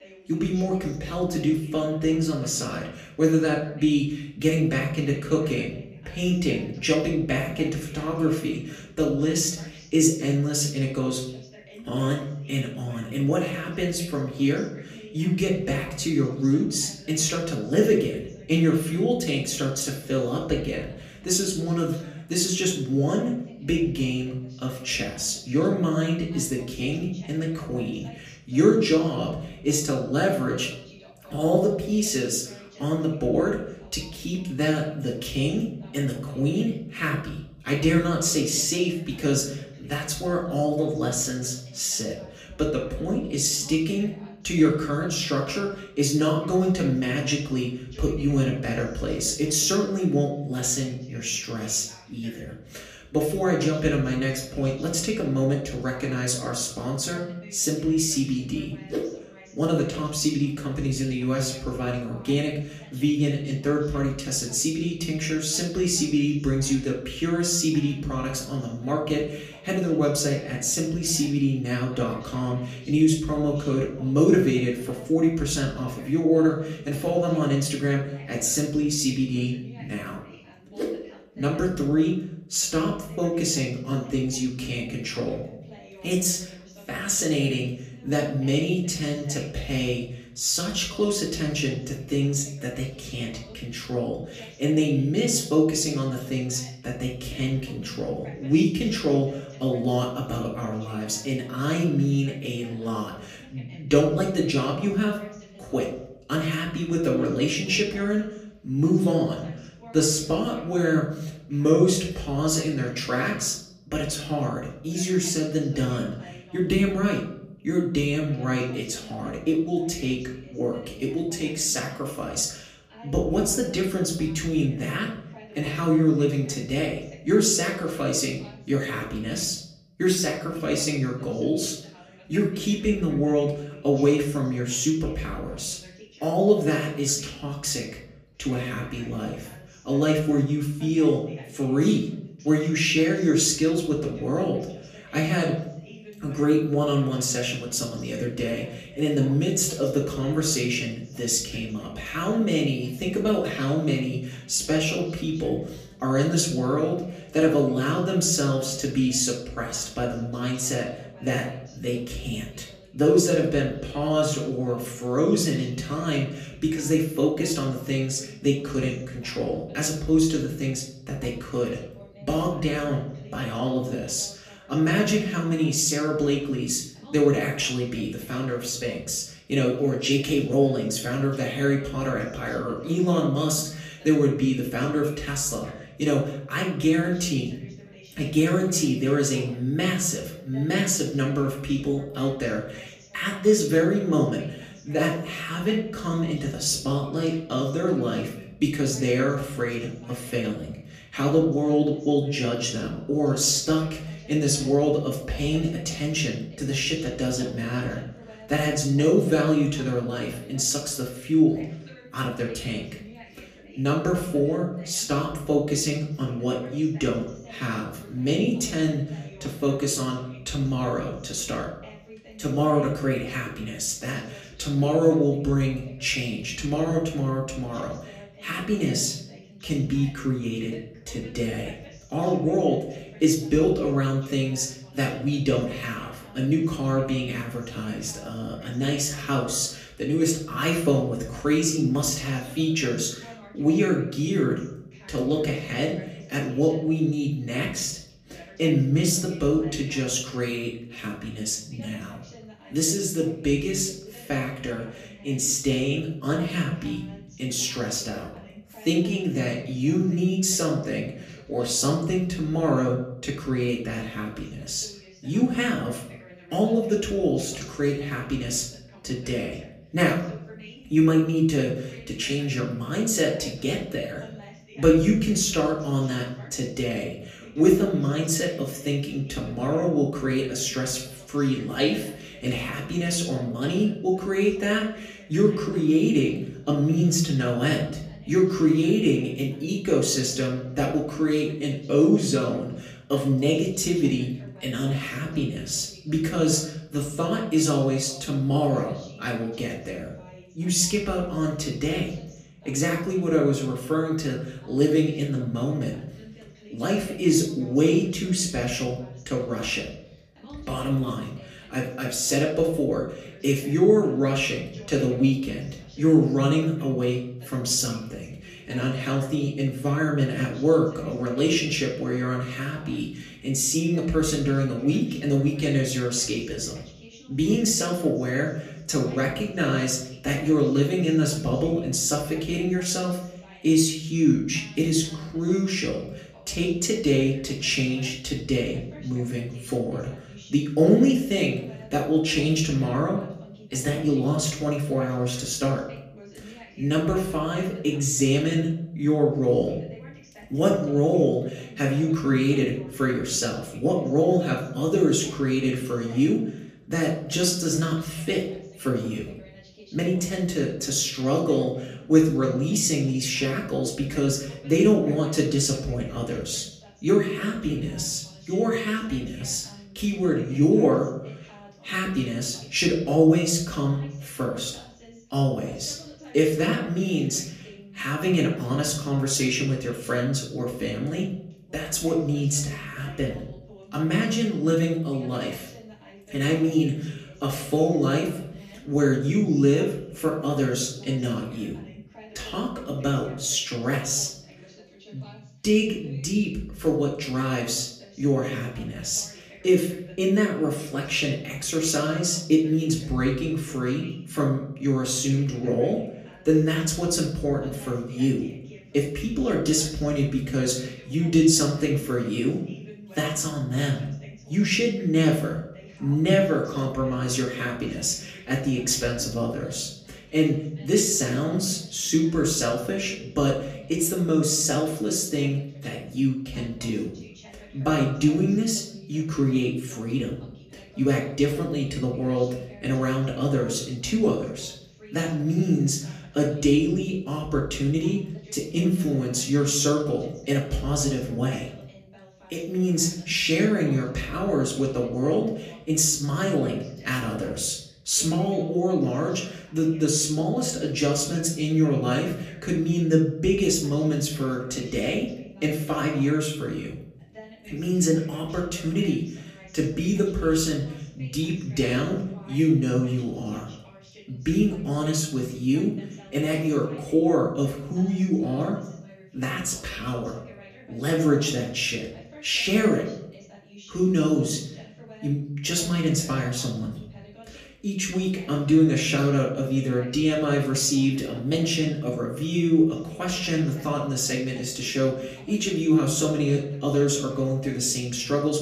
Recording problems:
off-mic speech; far
room echo; slight; dies away in 0.7 s
voice in the background; faint; throughout; 25 dB below the speech

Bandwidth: 14.5 kHz